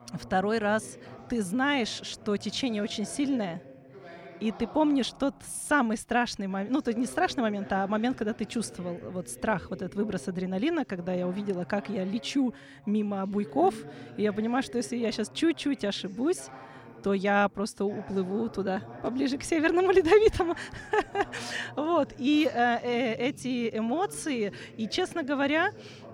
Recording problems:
voice in the background; noticeable; throughout; 20 dB below the speech

